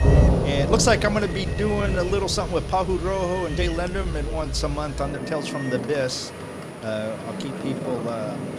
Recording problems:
rain or running water; loud; throughout; 2 dB below the speech
animal sounds; noticeable; throughout; 15 dB below the speech
high-pitched whine; faint; throughout; 9.5 kHz, 25 dB below the speech
uneven, jittery; strongly; from 0.5 to 8 s

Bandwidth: 14.5 kHz